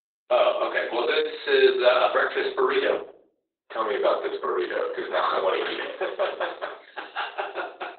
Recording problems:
off-mic speech; far
garbled, watery; badly; nothing above 4 kHz
thin; very; fading below 400 Hz
room echo; slight; dies away in 0.4 s

